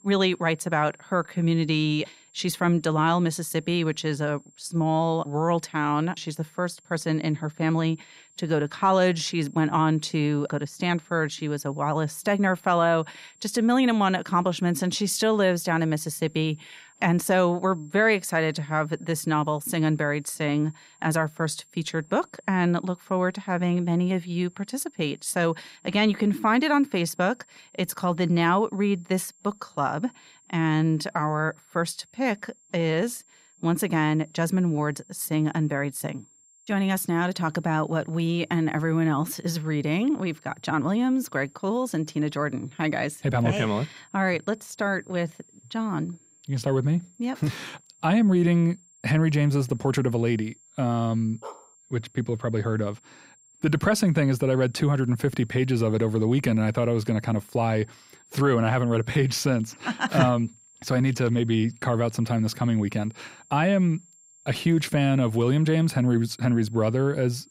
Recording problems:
high-pitched whine; faint; throughout; 7.5 kHz, 30 dB below the speech
dog barking; faint; at 51 s; peak 20 dB below the speech

